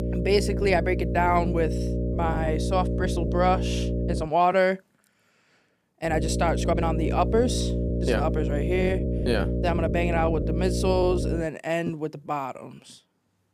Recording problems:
electrical hum; loud; until 4 s and from 6 to 11 s; 60 Hz, 8 dB below the speech
uneven, jittery; strongly; from 0.5 to 13 s

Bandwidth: 15 kHz